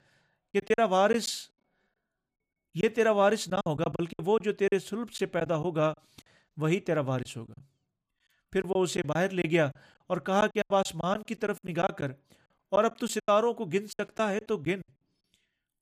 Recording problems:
choppy; very; 11% of the speech affected

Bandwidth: 15 kHz